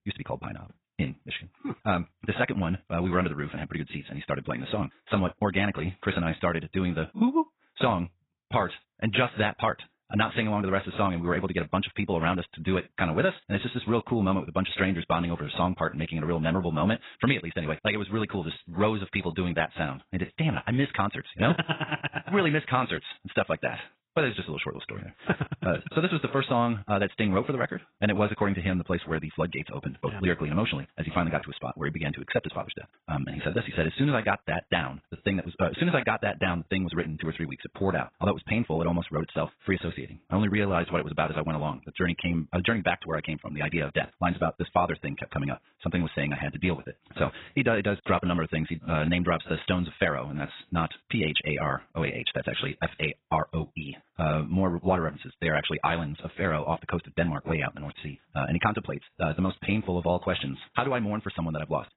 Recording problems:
garbled, watery; badly; nothing above 4 kHz
wrong speed, natural pitch; too fast; 1.5 times normal speed

